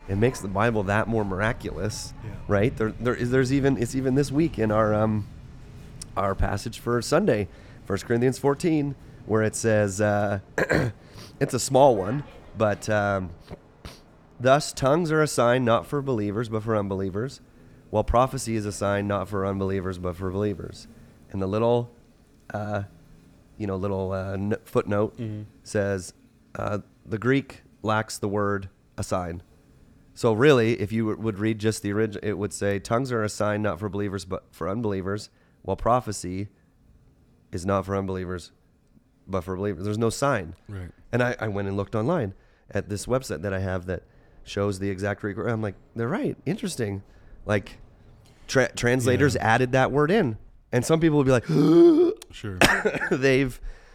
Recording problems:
rain or running water; faint; throughout; 25 dB below the speech

